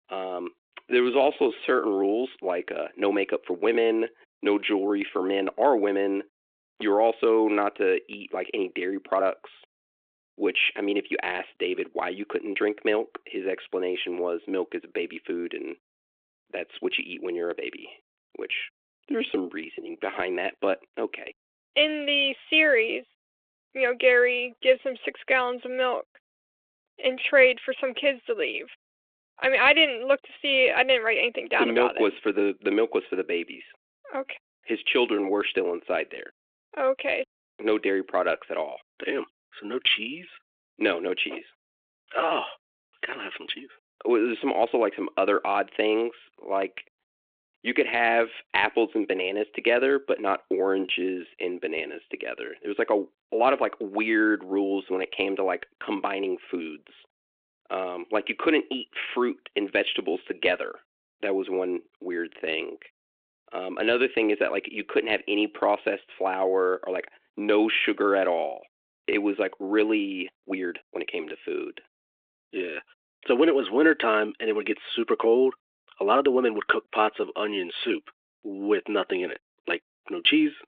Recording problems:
thin; somewhat; fading below 300 Hz
phone-call audio
uneven, jittery; strongly; from 0.5 s to 1:18

